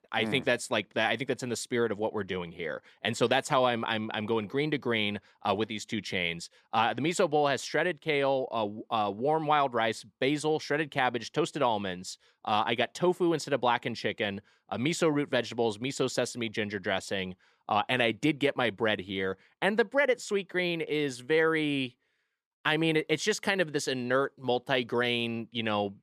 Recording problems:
none

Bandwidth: 14 kHz